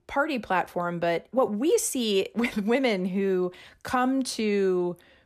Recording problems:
none

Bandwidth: 14 kHz